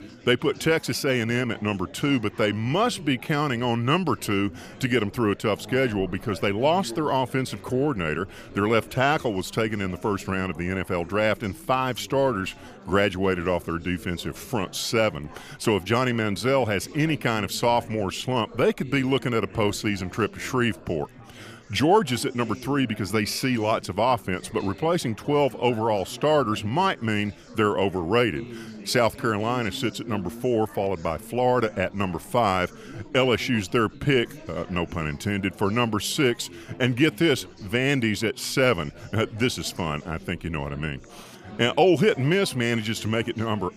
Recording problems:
chatter from many people; noticeable; throughout; 20 dB below the speech

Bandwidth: 15 kHz